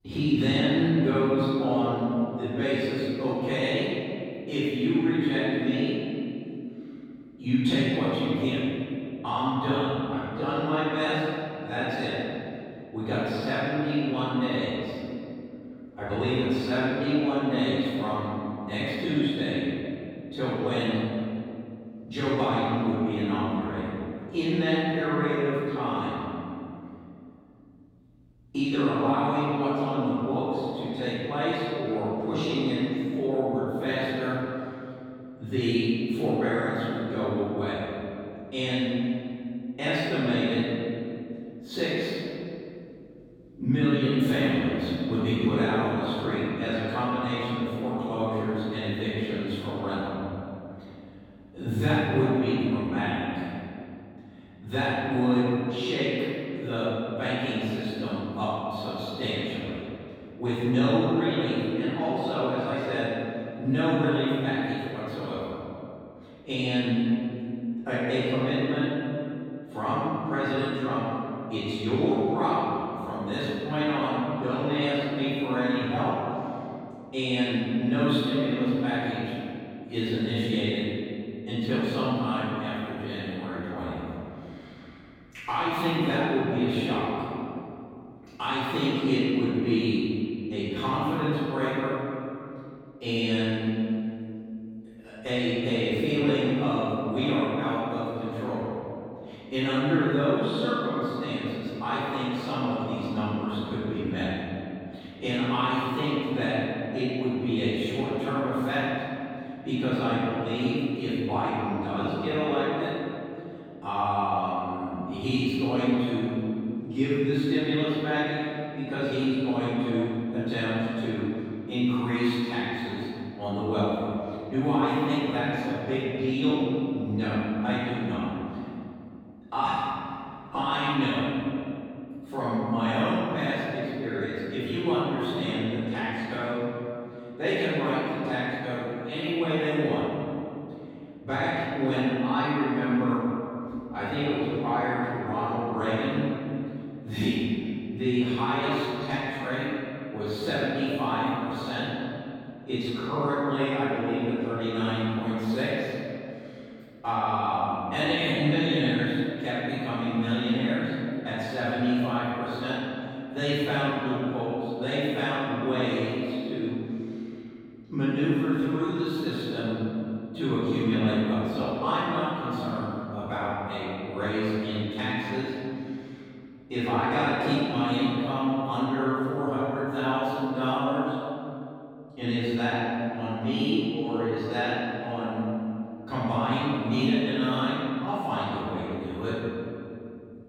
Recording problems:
room echo; strong; dies away in 2.7 s
off-mic speech; far

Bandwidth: 17.5 kHz